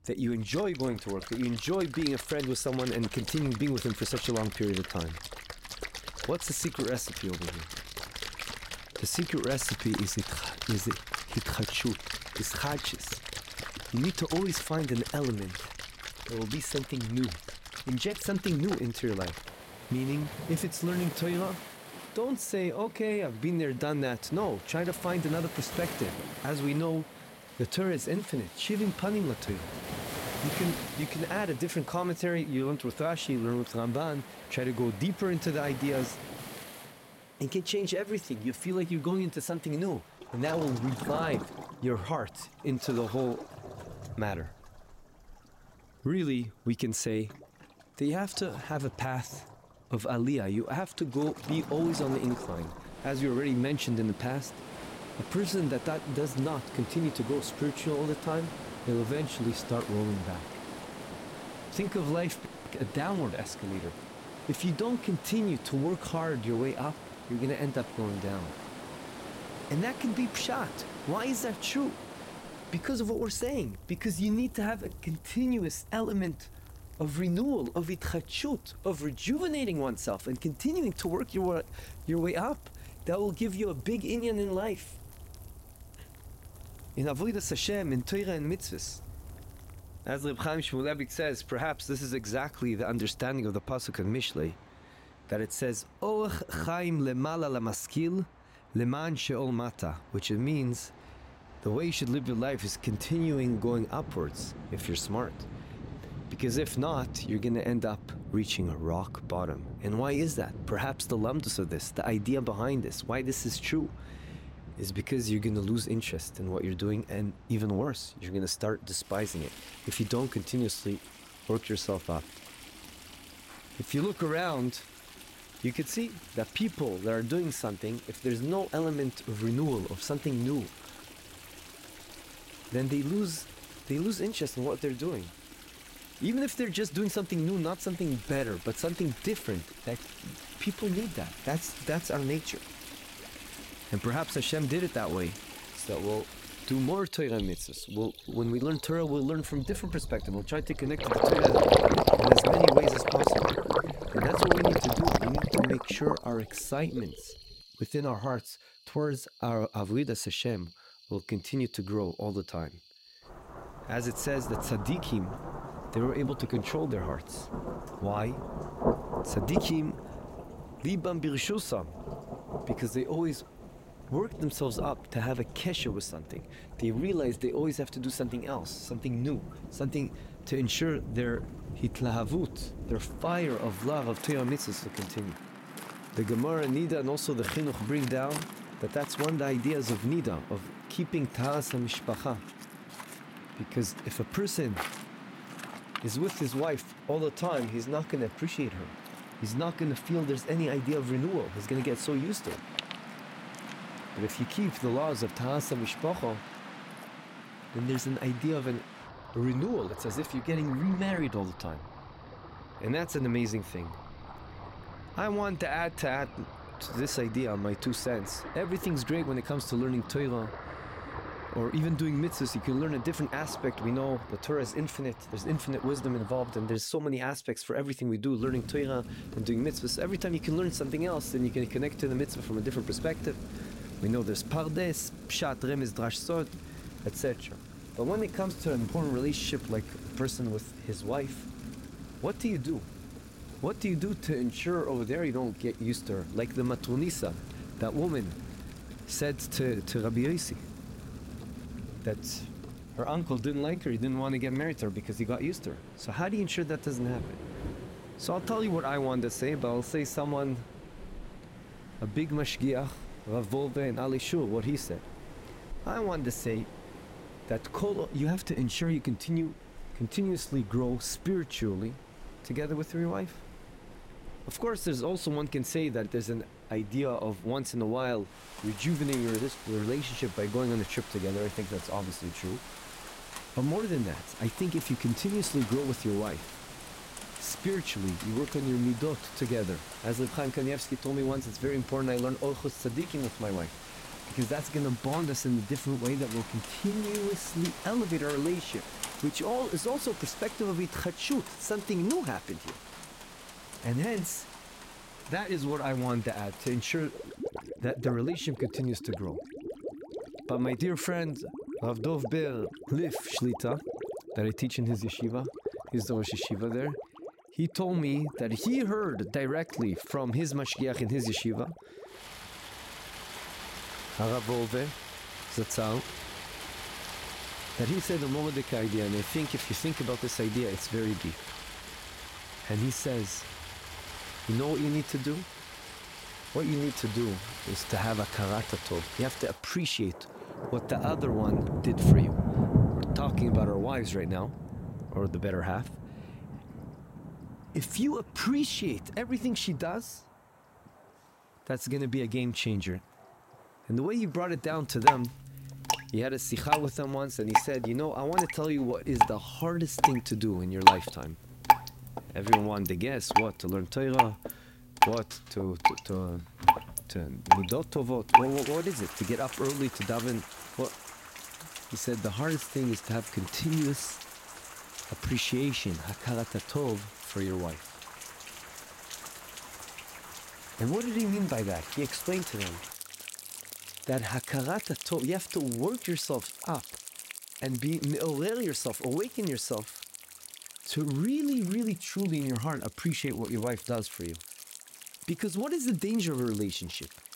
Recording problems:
rain or running water; loud; throughout; 4 dB below the speech

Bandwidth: 16 kHz